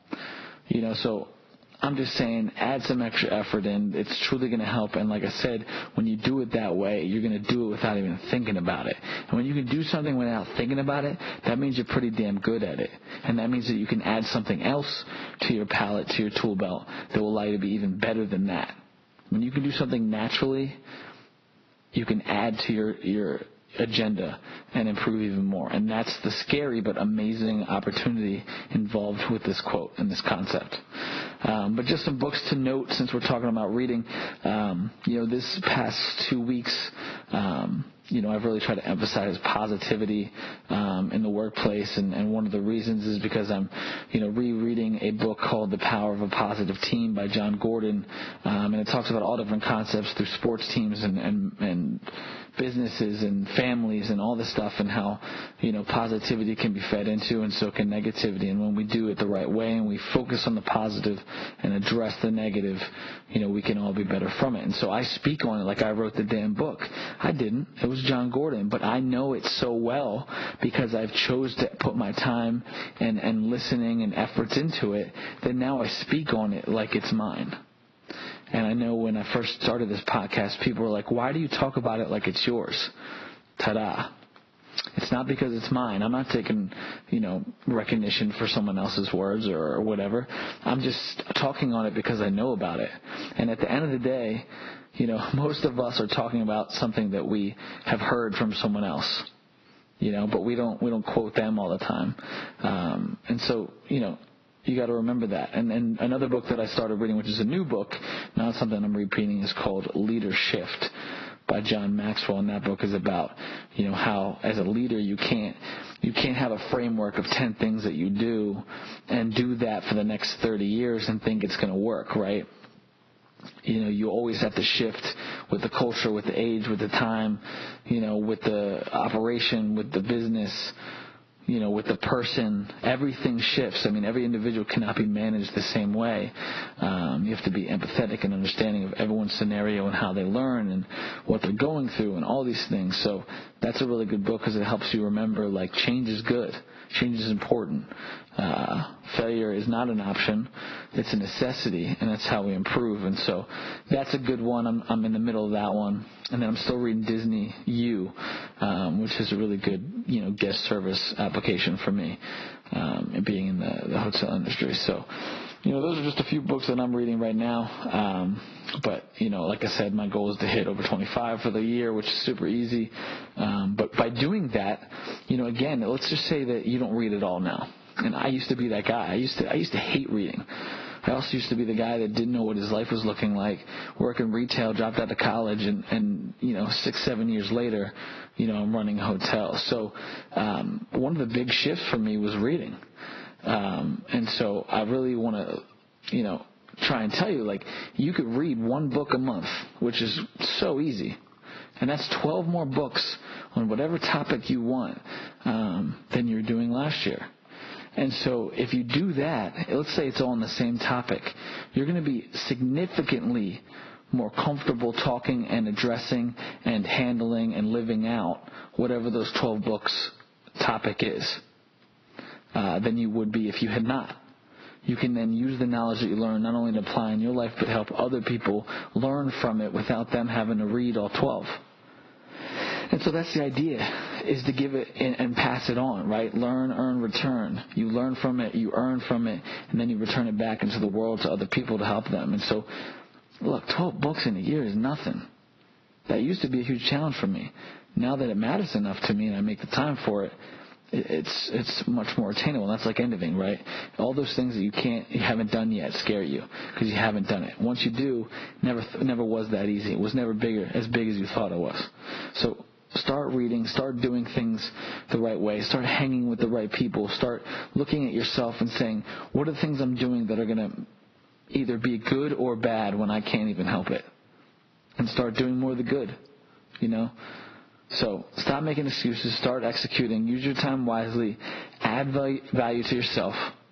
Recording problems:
garbled, watery; badly; nothing above 5.5 kHz
squashed, flat; somewhat

